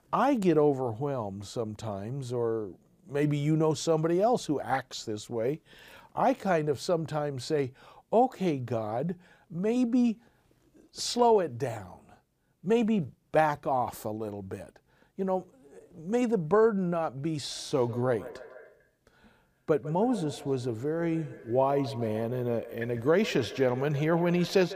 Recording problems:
echo of what is said; noticeable; from 17 s on; 150 ms later, 15 dB below the speech

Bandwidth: 15 kHz